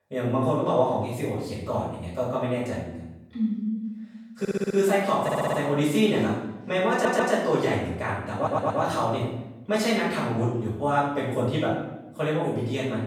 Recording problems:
off-mic speech; far
room echo; noticeable; dies away in 0.8 s
audio stuttering; 4 times, first at 4.5 s

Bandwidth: 18 kHz